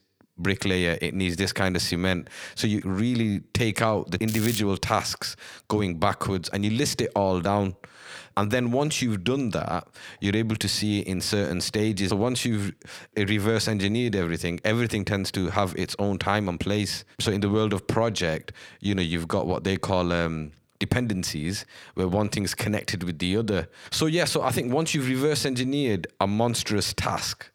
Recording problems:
crackling; loud; at 4.5 s; 8 dB below the speech

